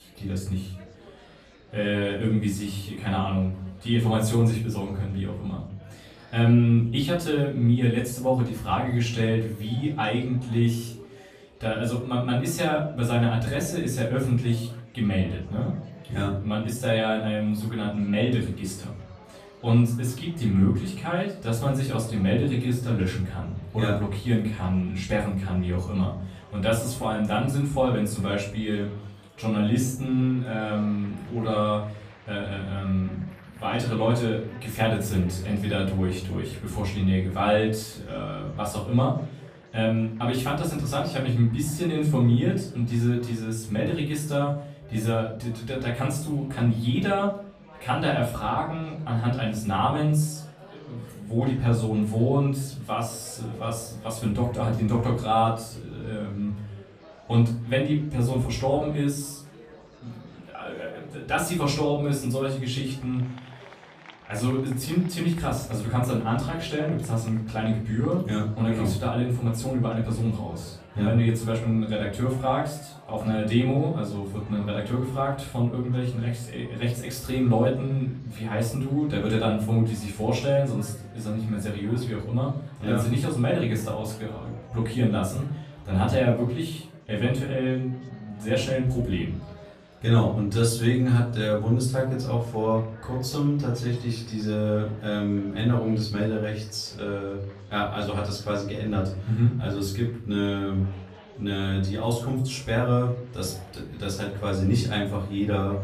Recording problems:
off-mic speech; far
room echo; slight; dies away in 0.4 s
murmuring crowd; faint; throughout; 25 dB below the speech

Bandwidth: 14.5 kHz